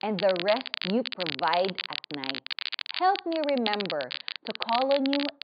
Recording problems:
high frequencies cut off; severe; nothing above 5 kHz
crackle, like an old record; loud; 5 dB below the speech

